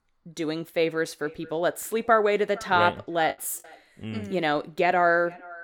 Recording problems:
echo of what is said; faint; throughout; 460 ms later, 25 dB below the speech
choppy; occasionally; at 3.5 s; 1% of the speech affected

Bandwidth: 17 kHz